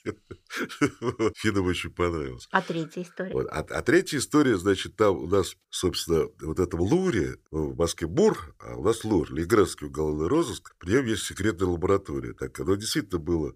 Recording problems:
none

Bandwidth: 15 kHz